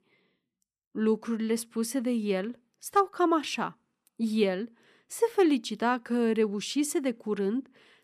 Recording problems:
none

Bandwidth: 14.5 kHz